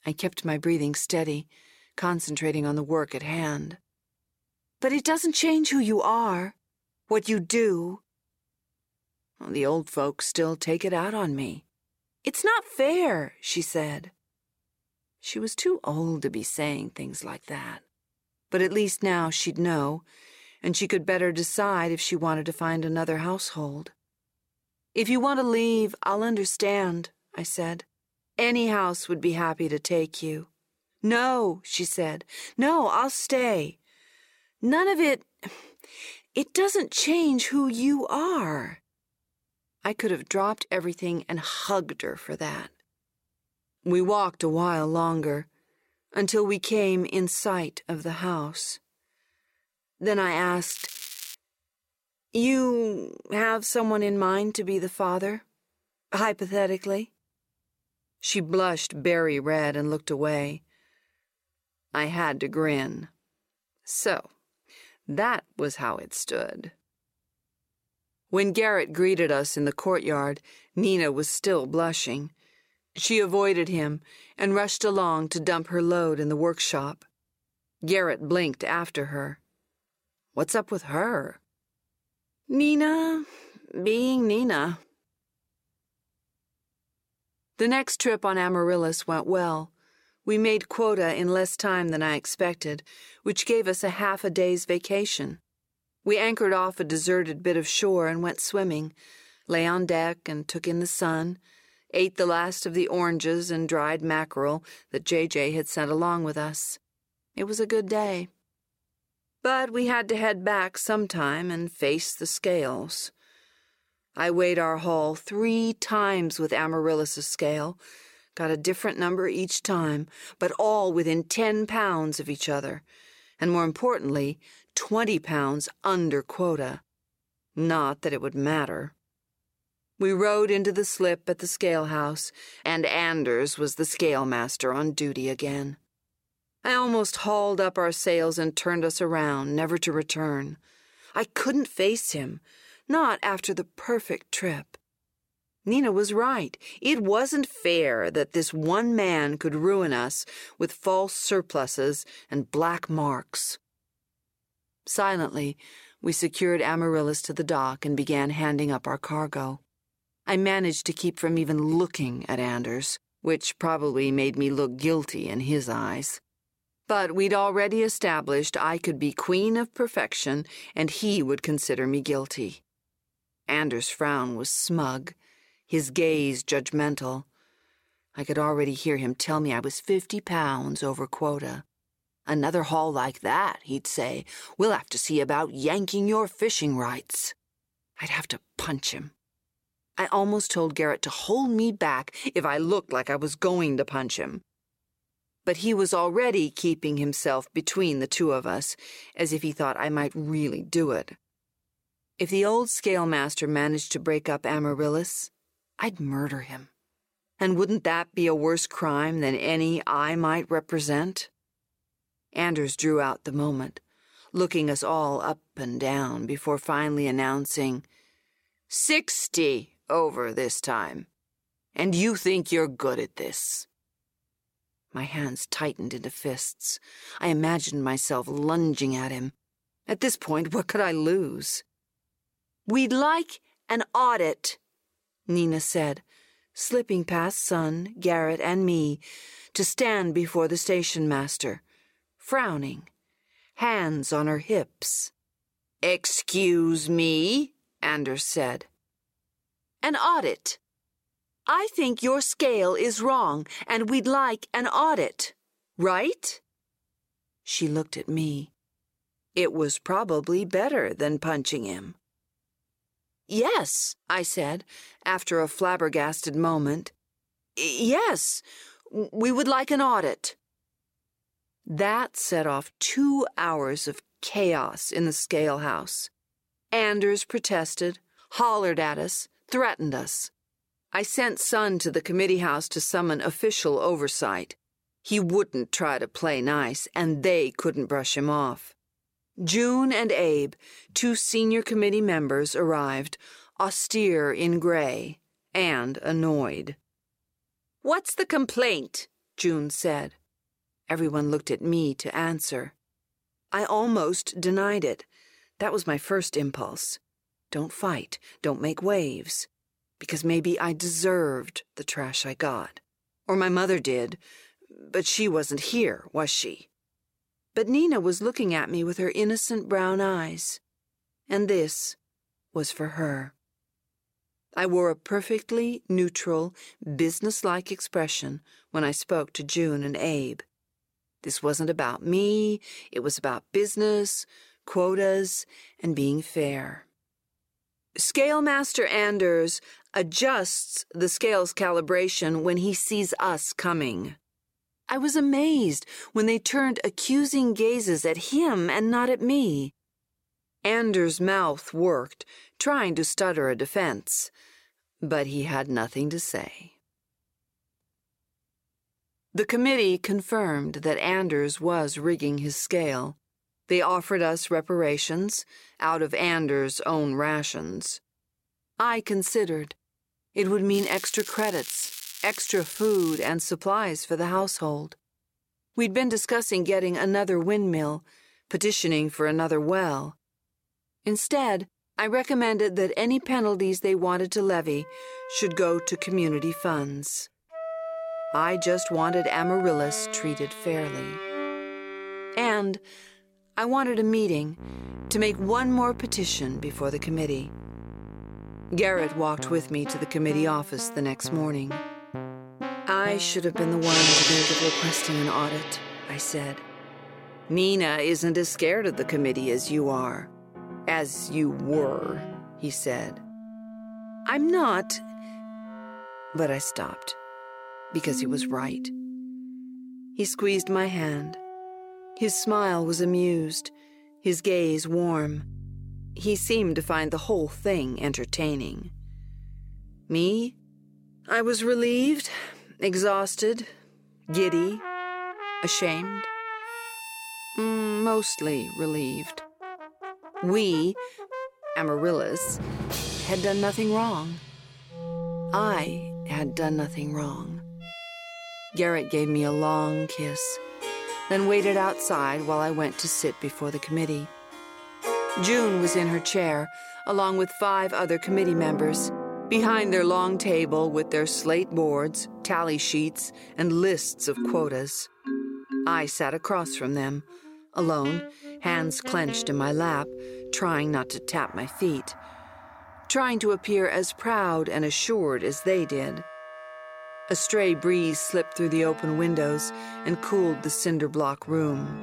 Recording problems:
background music; loud; from 6:25 on; 8 dB below the speech
crackling; noticeable; at 51 s and from 6:11 to 6:13; 10 dB below the speech

